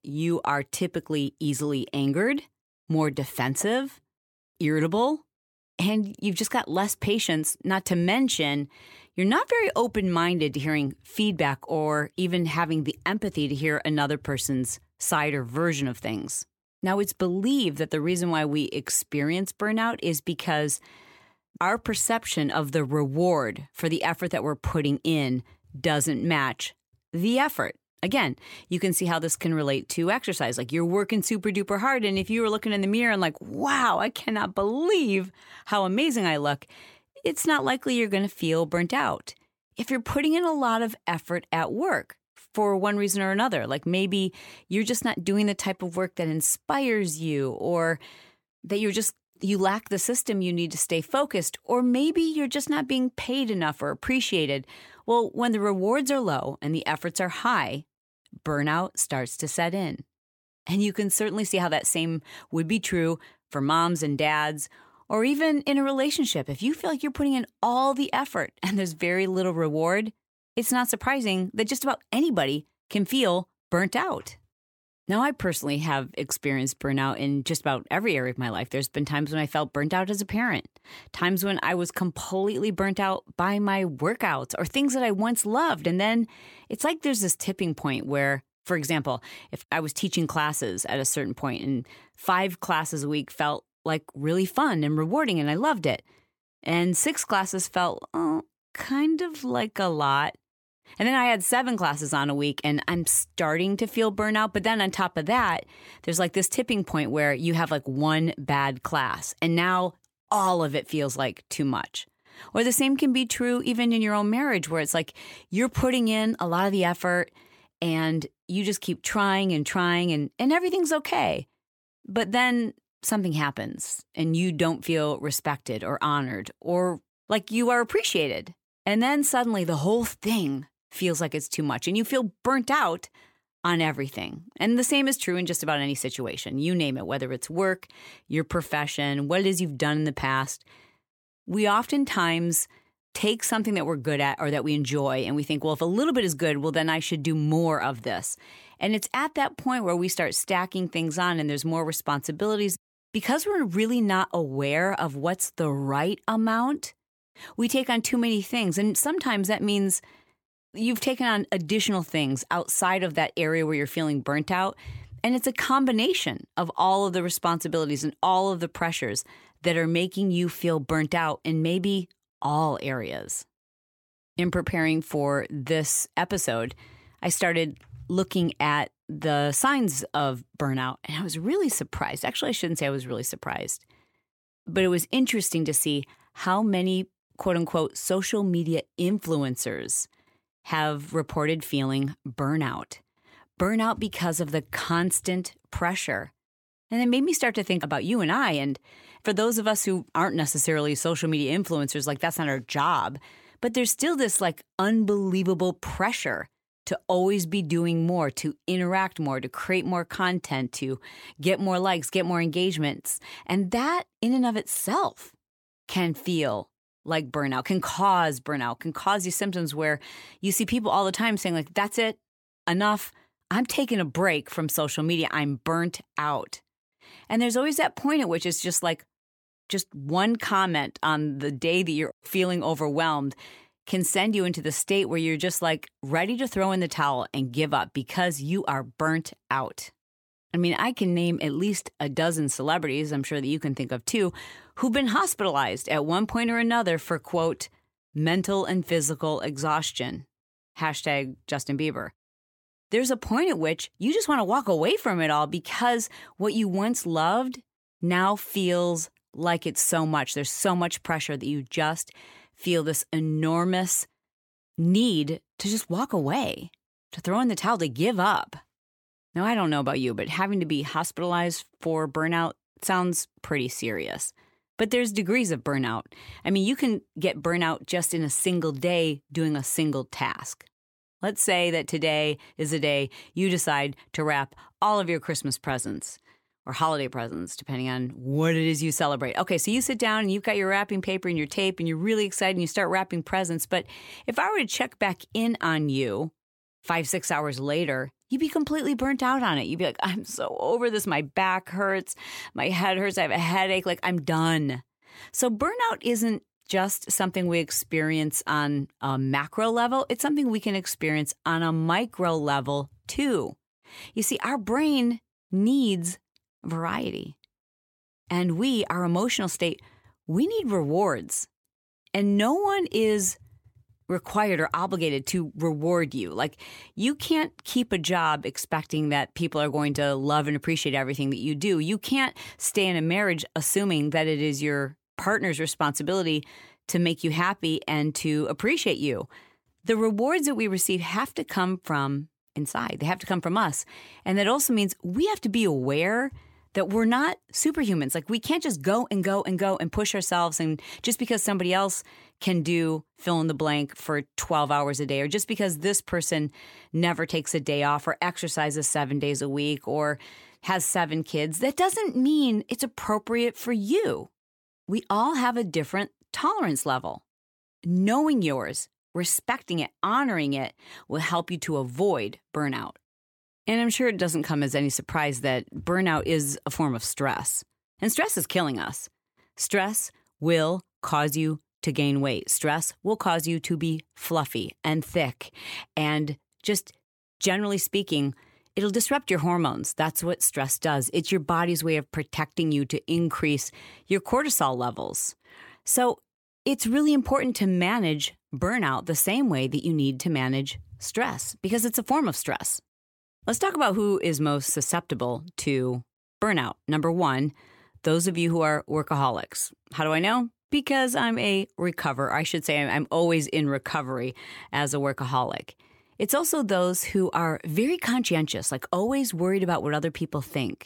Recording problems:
none

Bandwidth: 17.5 kHz